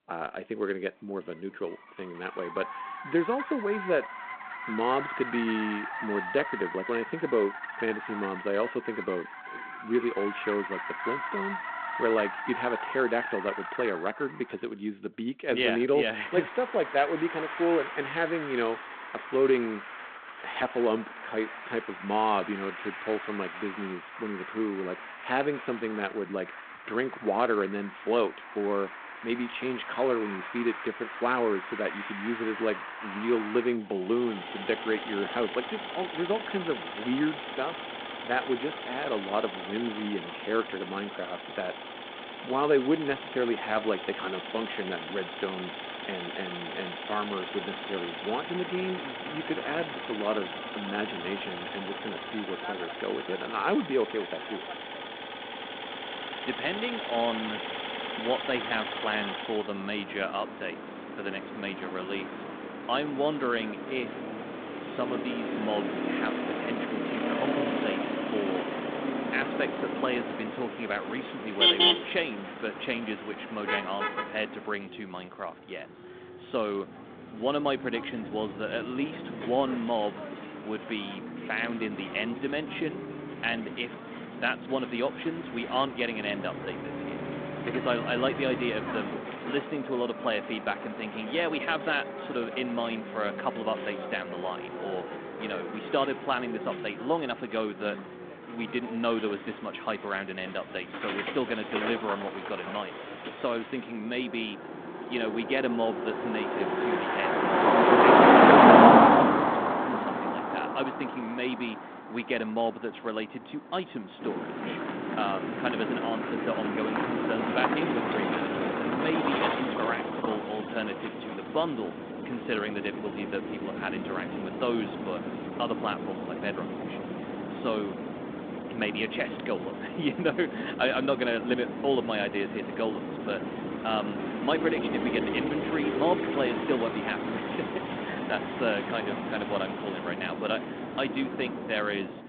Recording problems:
phone-call audio
traffic noise; very loud; throughout; 1 dB above the speech

